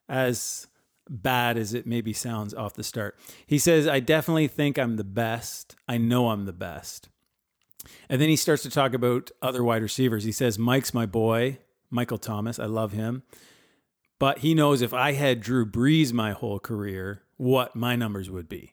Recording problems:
none

